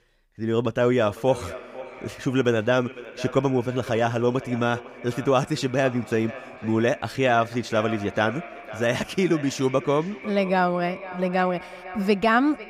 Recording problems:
echo of what is said; noticeable; throughout; 500 ms later, 15 dB below the speech

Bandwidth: 15.5 kHz